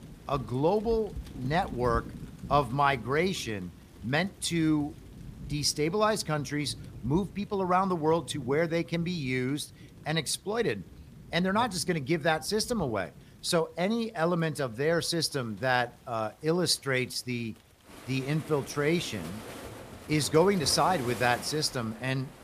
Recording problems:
rain or running water; noticeable; throughout; 15 dB below the speech

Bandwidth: 15 kHz